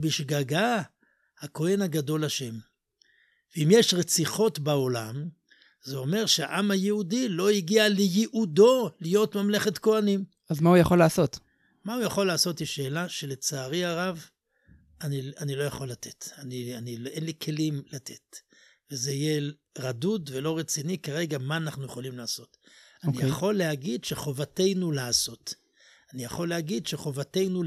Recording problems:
abrupt cut into speech; at the start and the end

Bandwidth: 13.5 kHz